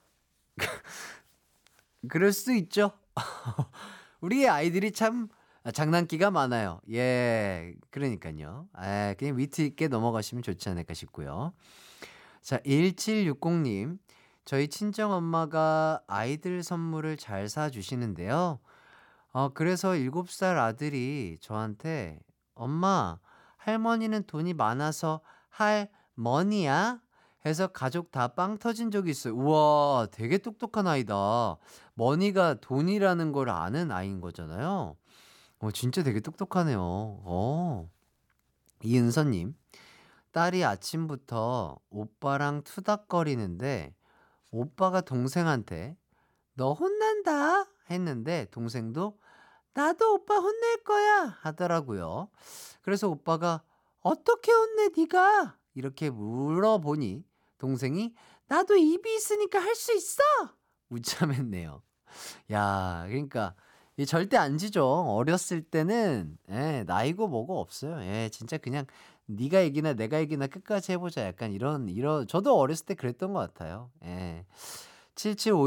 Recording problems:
abrupt cut into speech; at the end

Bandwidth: 18 kHz